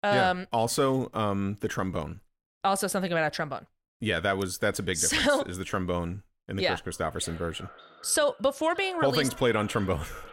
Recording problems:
echo of what is said; faint; from 7 s on; 580 ms later, 20 dB below the speech

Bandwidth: 16 kHz